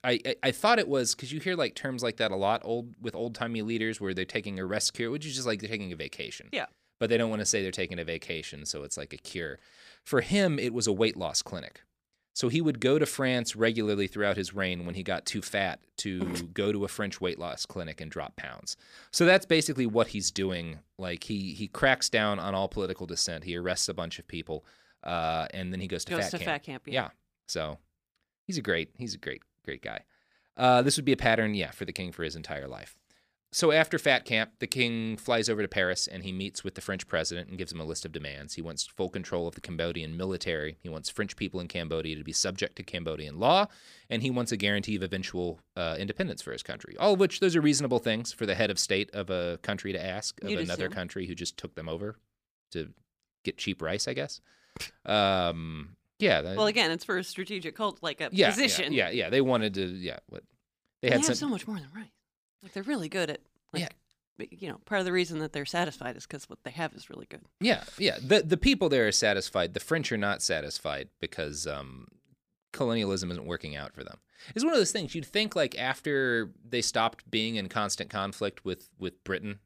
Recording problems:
none

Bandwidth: 15 kHz